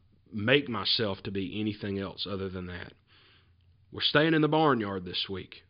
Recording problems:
high frequencies cut off; severe; nothing above 5 kHz

